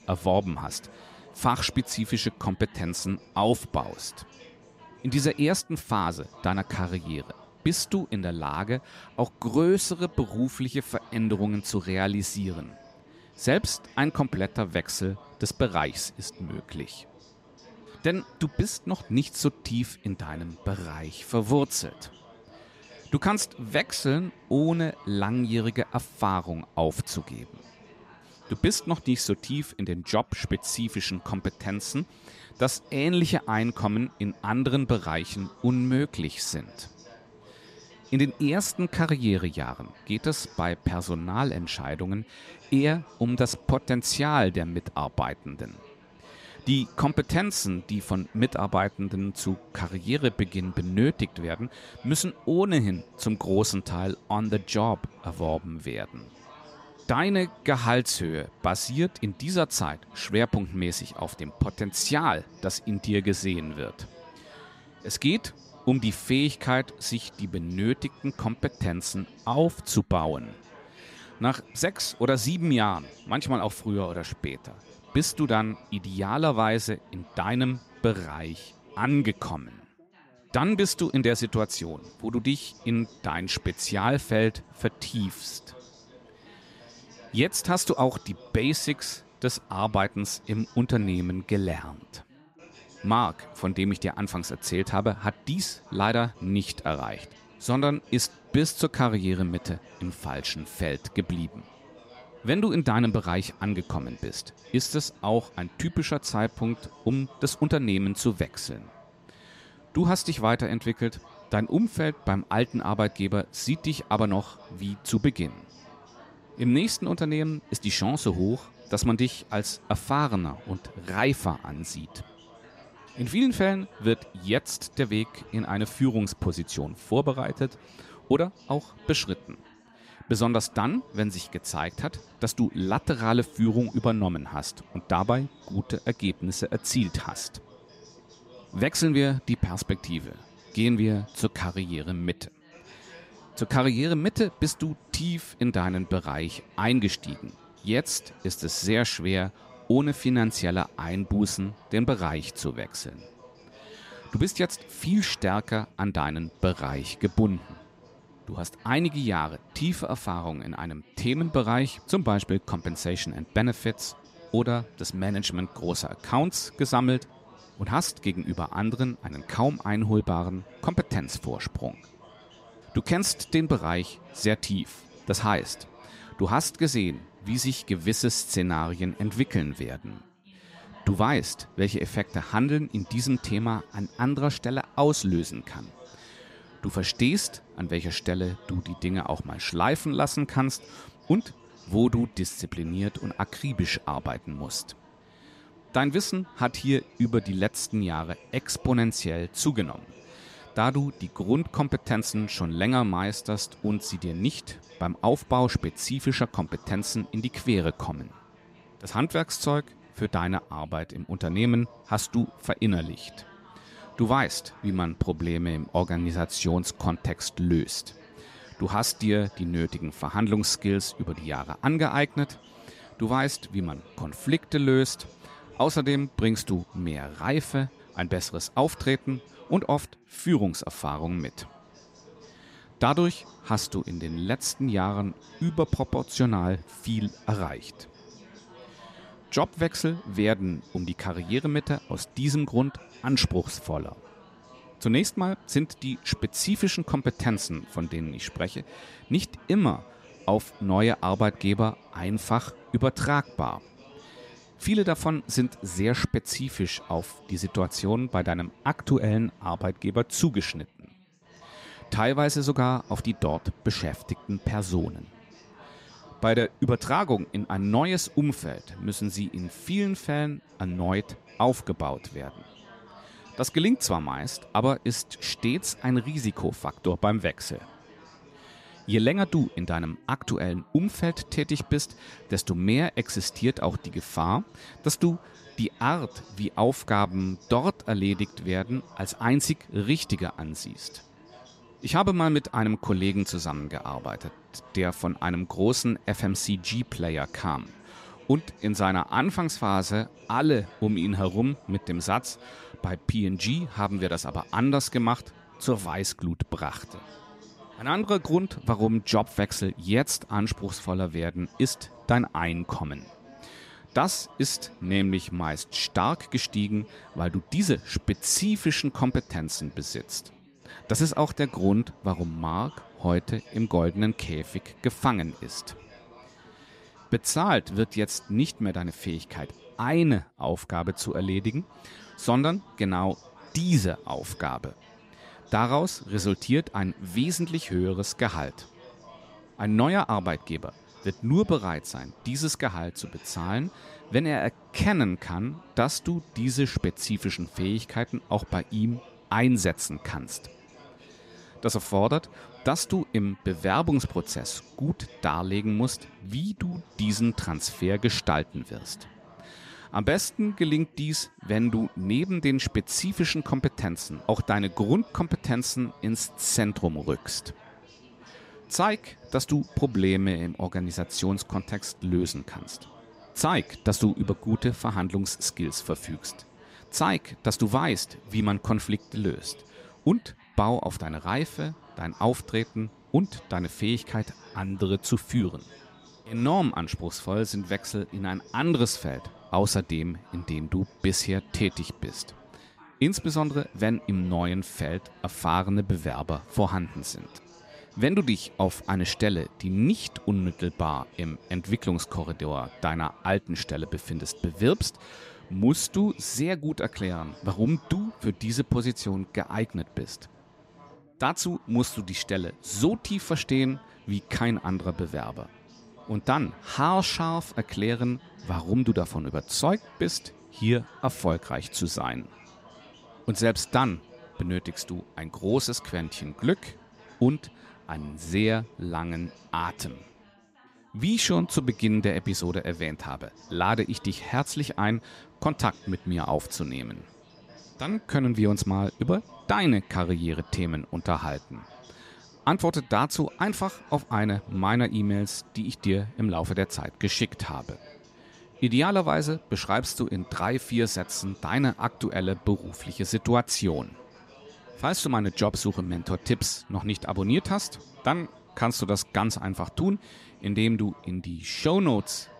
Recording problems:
background chatter; faint; throughout; 3 voices, 25 dB below the speech

